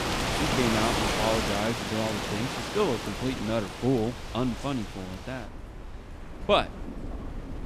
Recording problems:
rain or running water; loud; throughout; 1 dB below the speech
wind noise on the microphone; occasional gusts; 25 dB below the speech

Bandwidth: 14.5 kHz